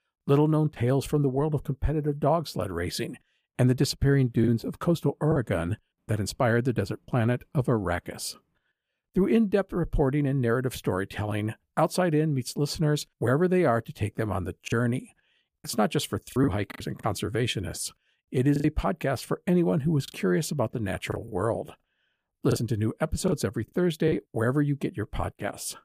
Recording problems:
choppy; very; from 4.5 to 7 s, from 15 to 19 s and from 21 to 24 s; 6% of the speech affected

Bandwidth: 15 kHz